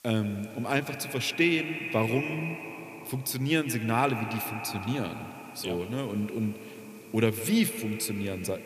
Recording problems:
echo of what is said; strong; throughout; 150 ms later, 9 dB below the speech
hiss; faint; throughout; 25 dB below the speech

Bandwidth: 14.5 kHz